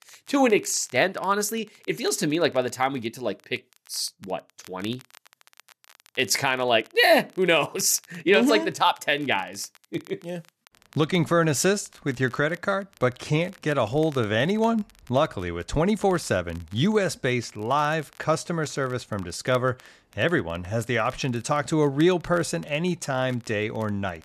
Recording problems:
crackle, like an old record; faint; 30 dB below the speech

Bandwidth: 13.5 kHz